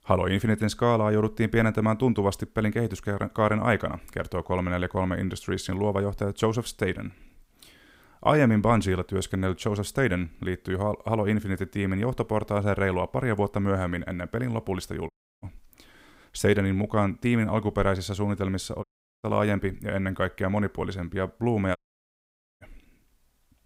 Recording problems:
audio cutting out; at 15 s, at 19 s and at 22 s for 1 s

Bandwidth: 15.5 kHz